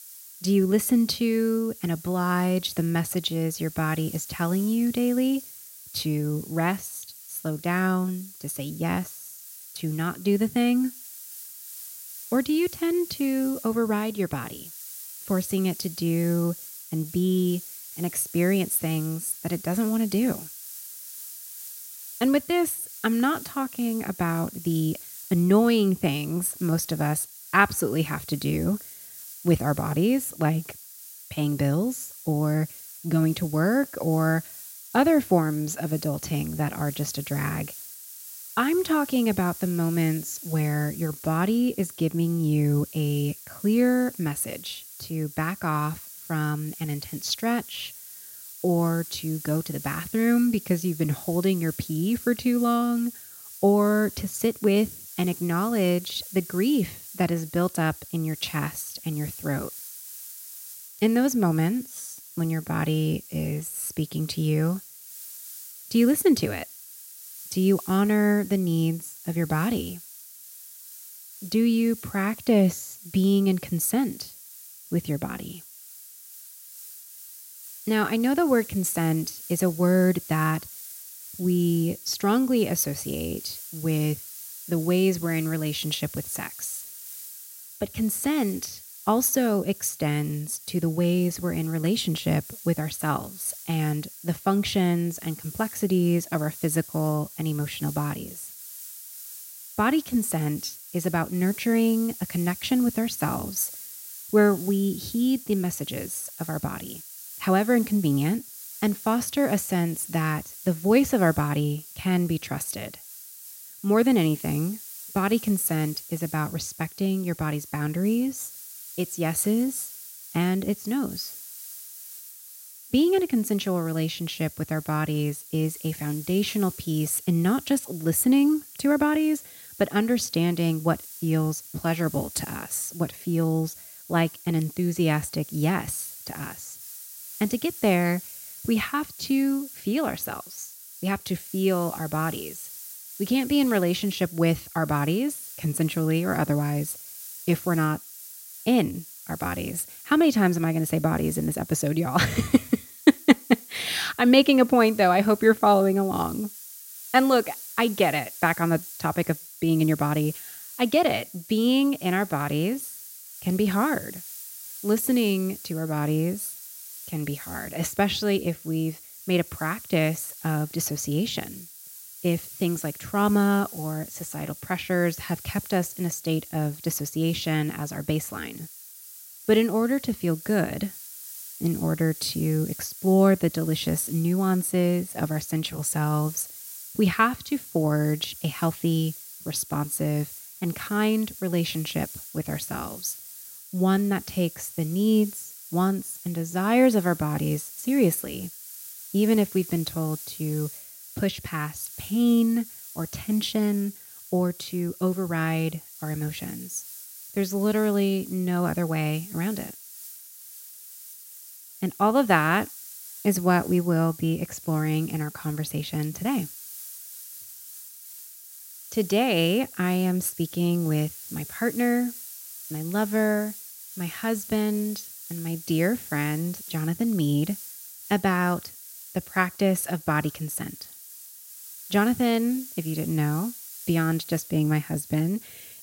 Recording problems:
hiss; noticeable; throughout; 15 dB below the speech

